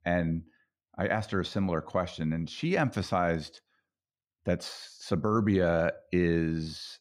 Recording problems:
none

